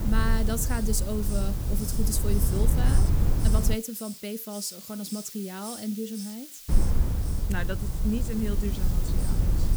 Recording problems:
hiss; loud; throughout; 8 dB below the speech
low rumble; loud; until 3.5 s and from 6.5 s on; 5 dB below the speech

